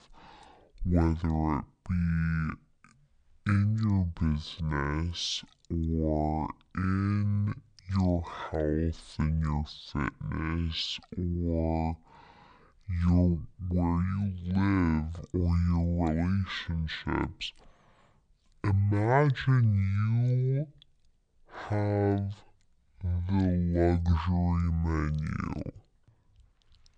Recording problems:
wrong speed and pitch; too slow and too low; 0.5 times normal speed

